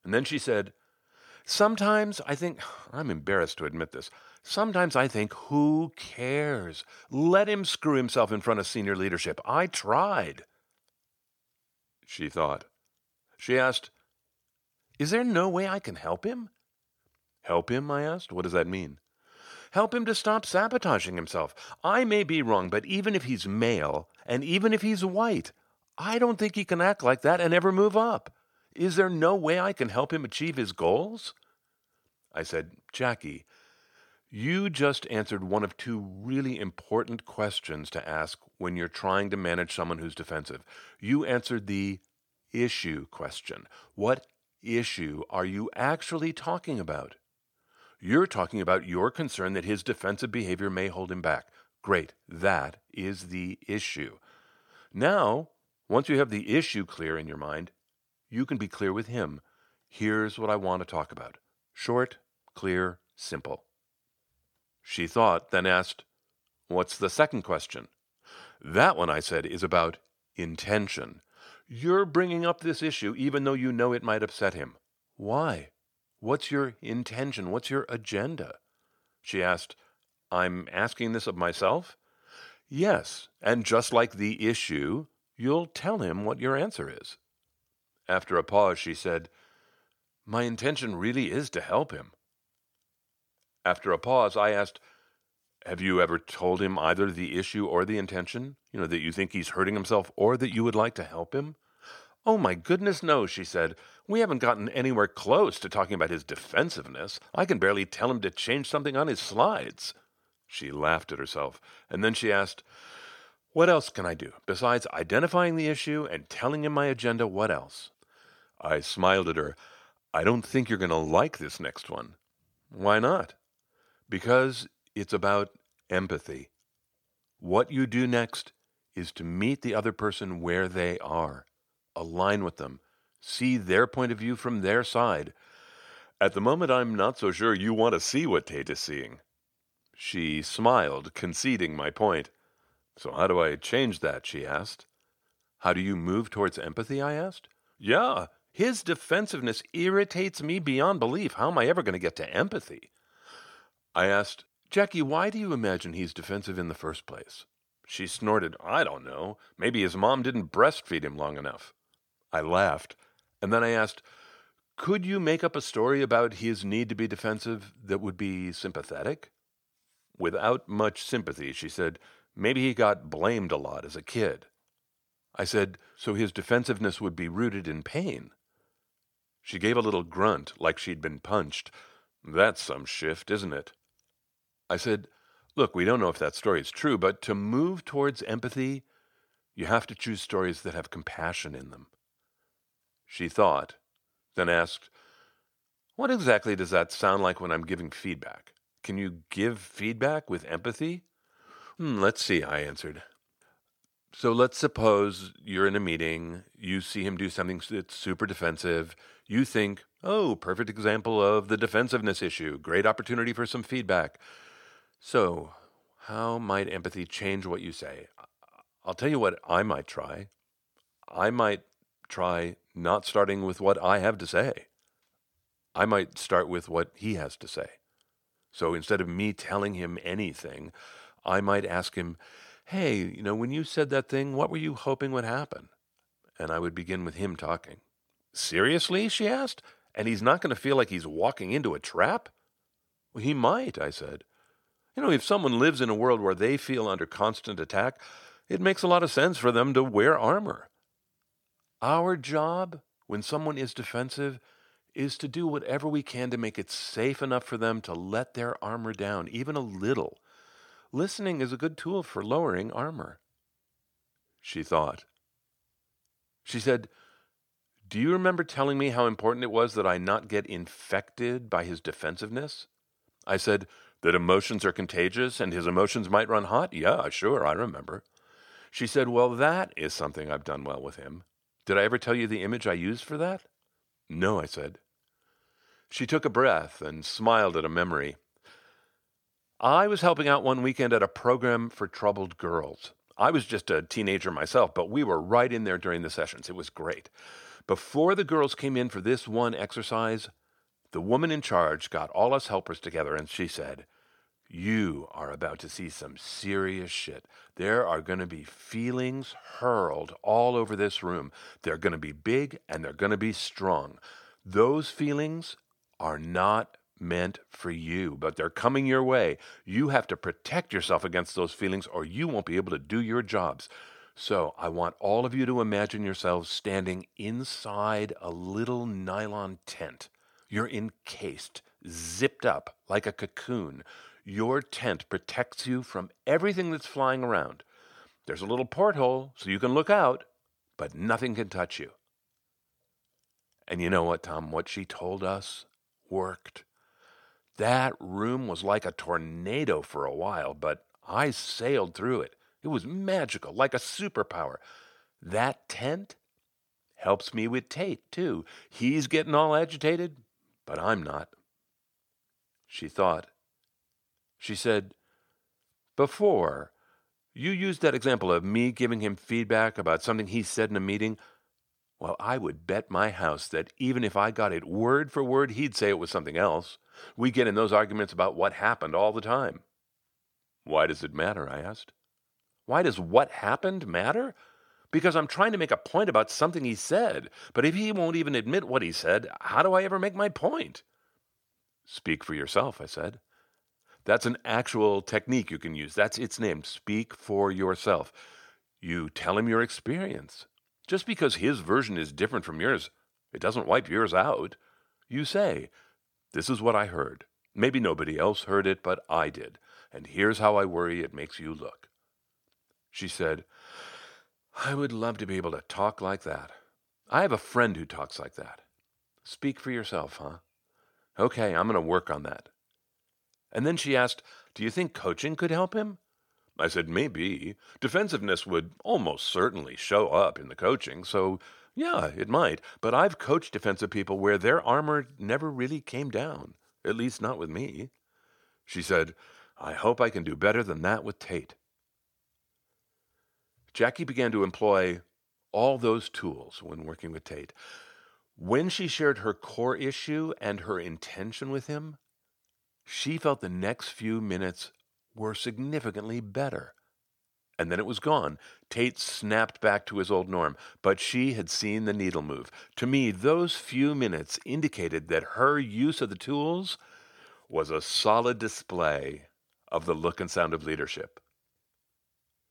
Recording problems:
none

